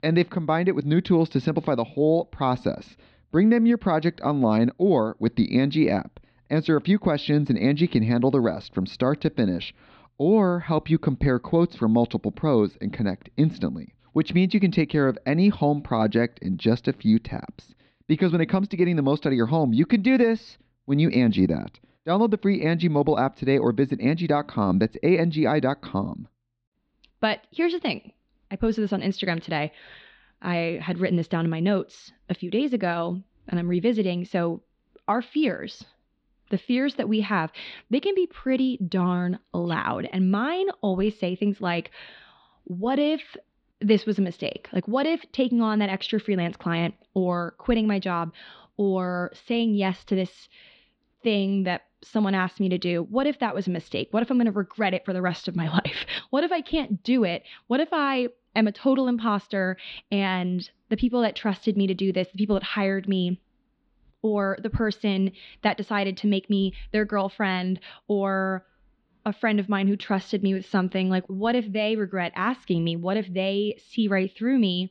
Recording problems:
muffled; slightly; fading above 4 kHz

